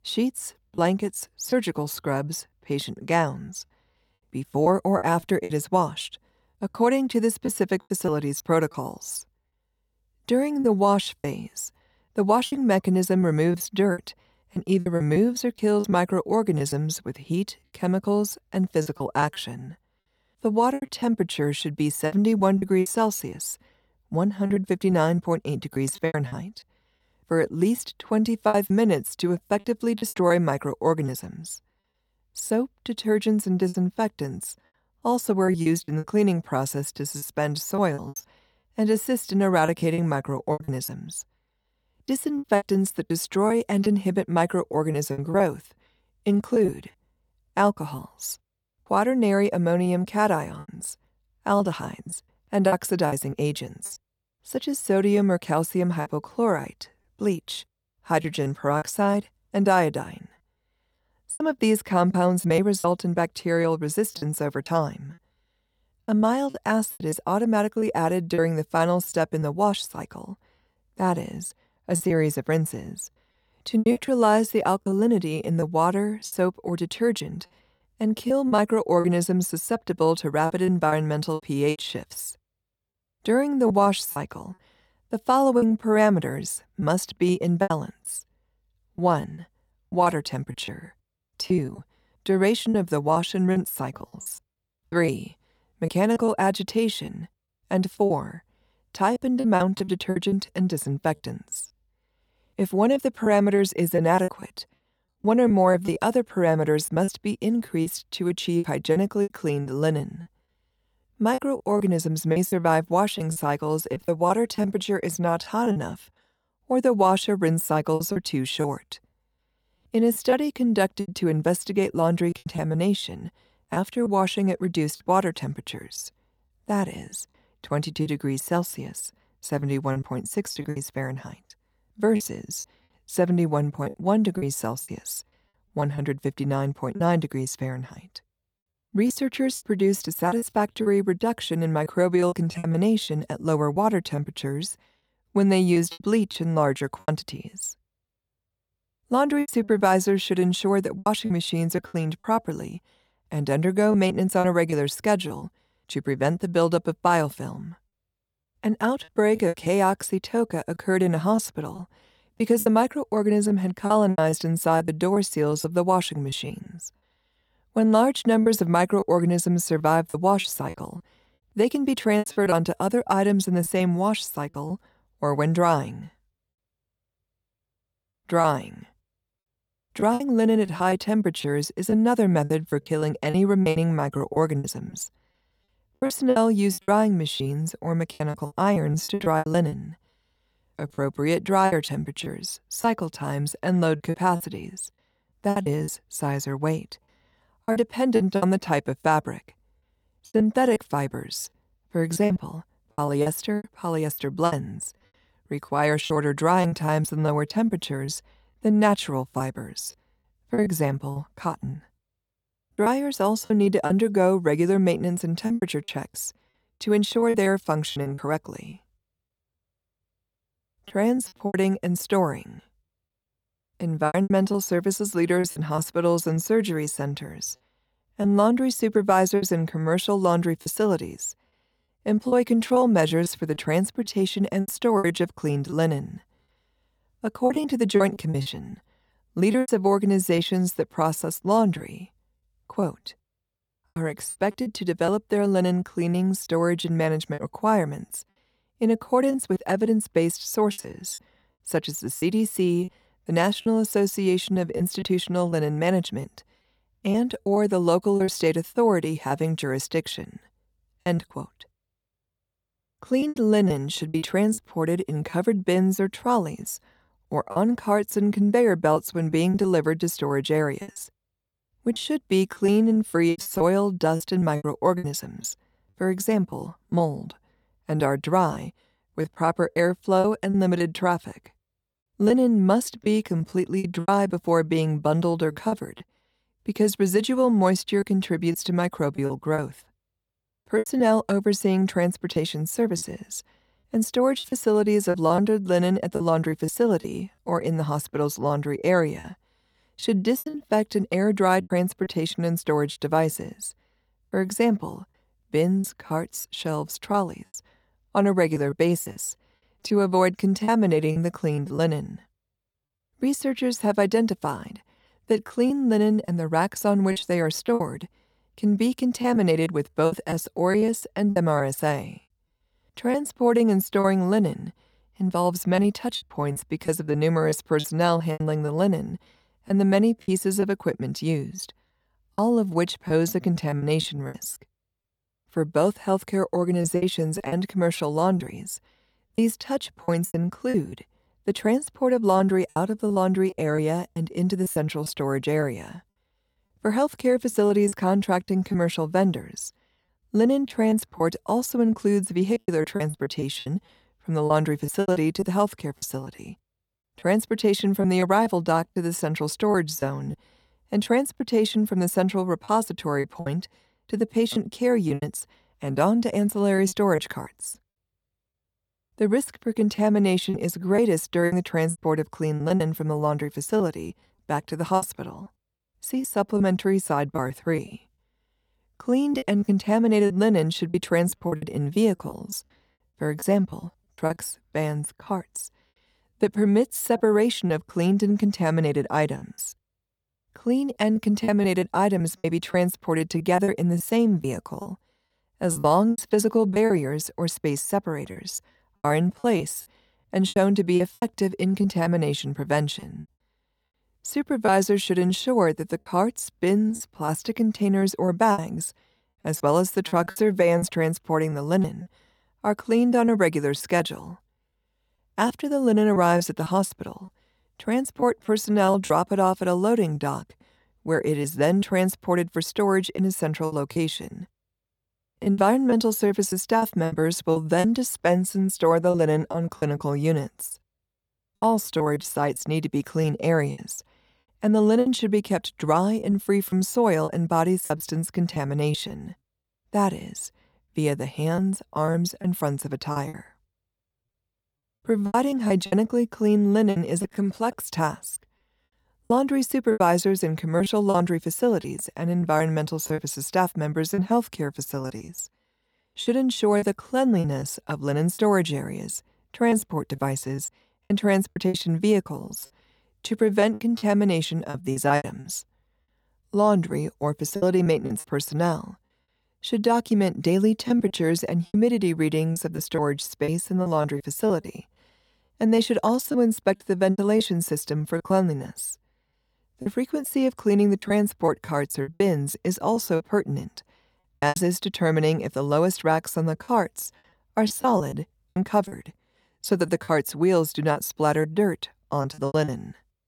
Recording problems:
choppy; very; 8% of the speech affected

